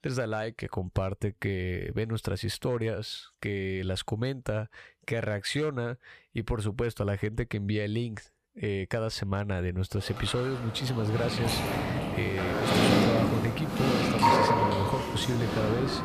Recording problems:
animal sounds; very loud; from 11 s on; 4 dB above the speech

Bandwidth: 14.5 kHz